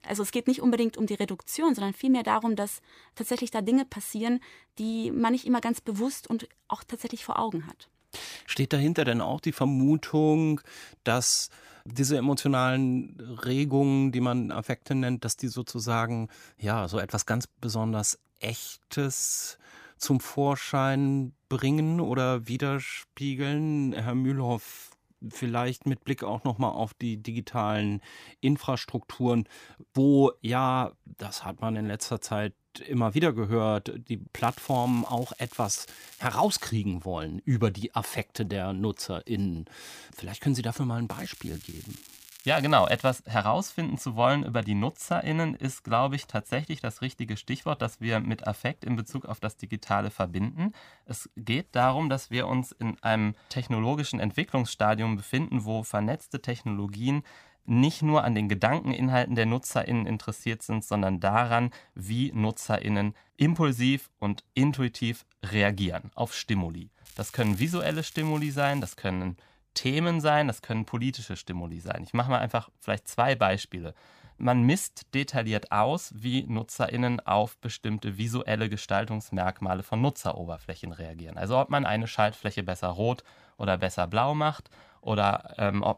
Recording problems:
crackling; noticeable; from 34 to 37 s, from 41 to 43 s and from 1:07 to 1:09; 20 dB below the speech

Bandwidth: 15 kHz